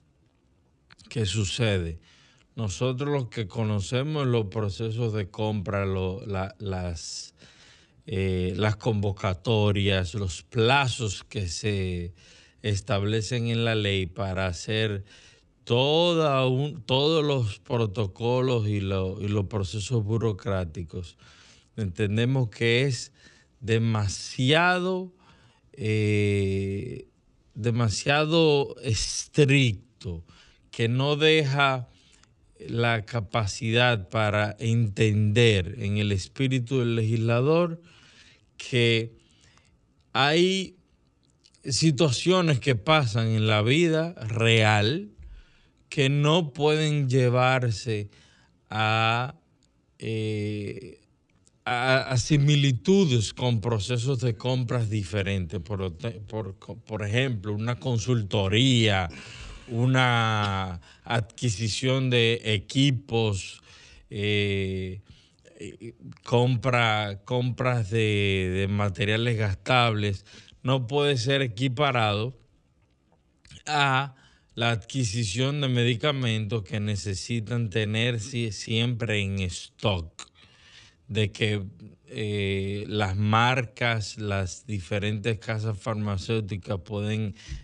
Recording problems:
wrong speed, natural pitch; too slow; 0.6 times normal speed

